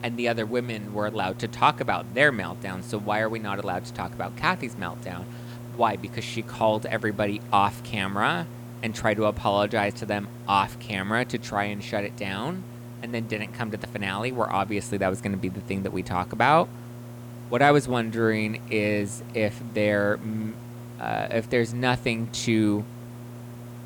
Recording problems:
electrical hum; faint; throughout; 60 Hz, 25 dB below the speech
hiss; faint; throughout; 25 dB below the speech

